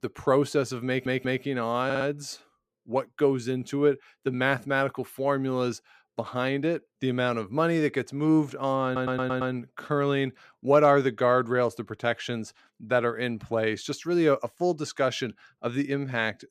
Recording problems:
audio stuttering; at 1 s, at 2 s and at 9 s

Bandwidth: 15 kHz